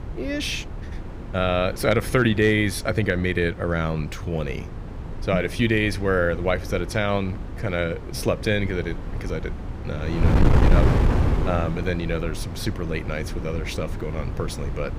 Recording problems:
wind noise on the microphone; heavy; 10 dB below the speech

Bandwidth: 15.5 kHz